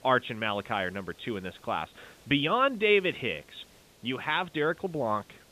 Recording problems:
high frequencies cut off; severe; nothing above 4 kHz
hiss; faint; throughout; 25 dB below the speech

